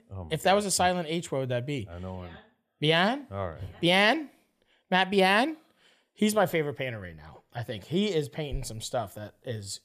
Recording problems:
none

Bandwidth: 14.5 kHz